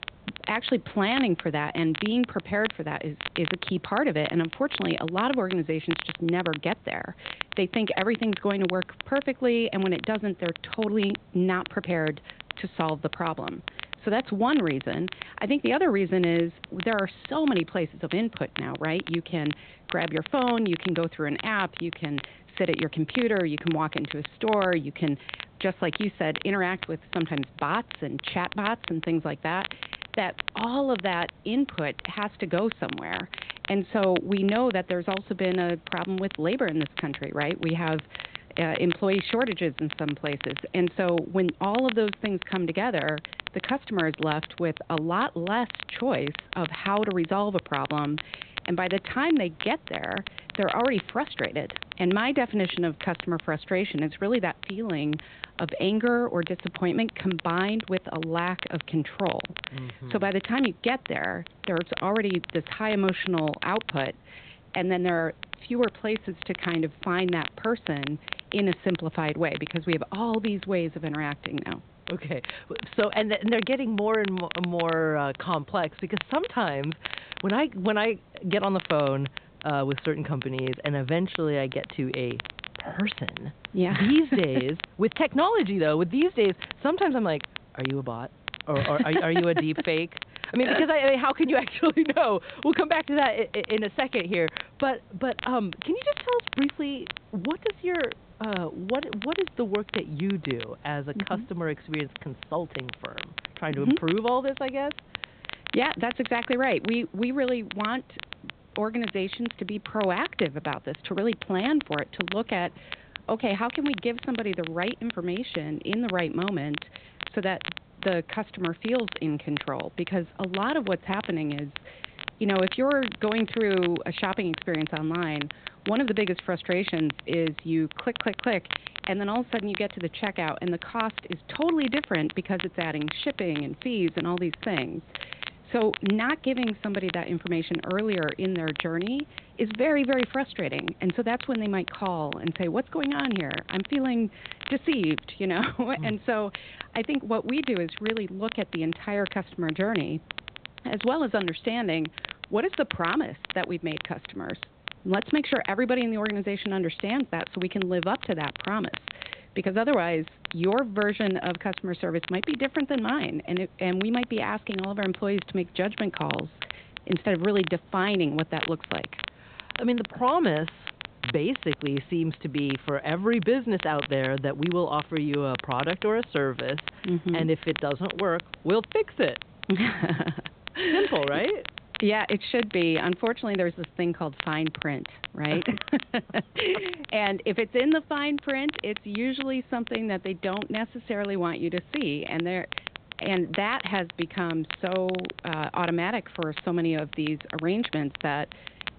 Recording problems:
high frequencies cut off; severe; nothing above 4 kHz
crackle, like an old record; noticeable; 10 dB below the speech
hiss; faint; throughout; 25 dB below the speech

